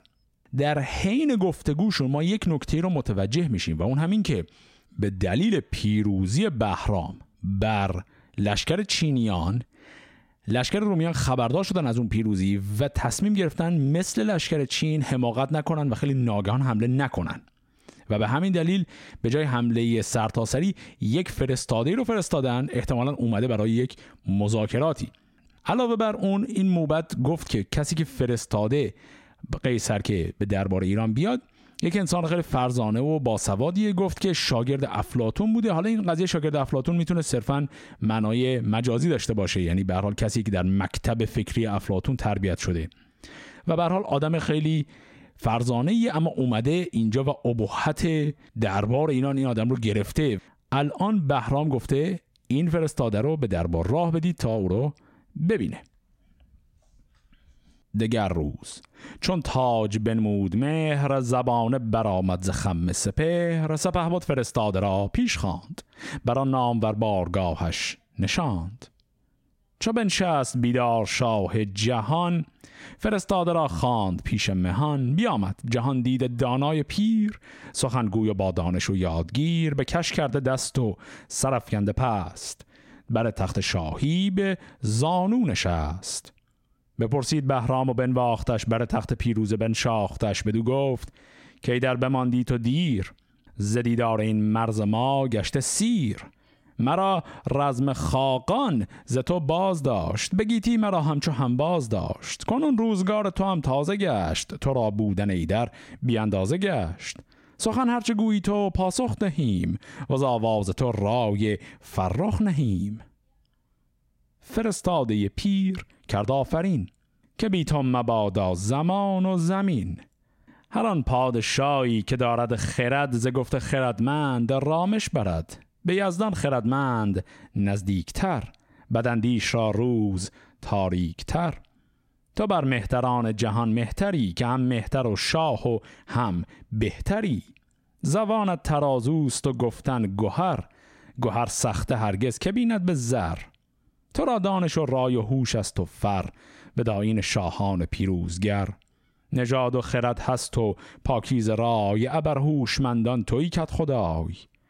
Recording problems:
squashed, flat; heavily

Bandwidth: 16 kHz